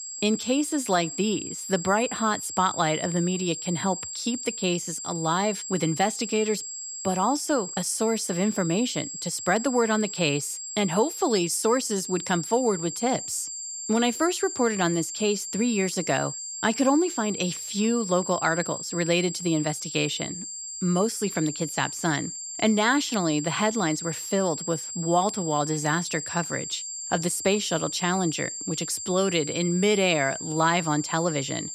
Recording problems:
high-pitched whine; loud; throughout; 7.5 kHz, 7 dB below the speech

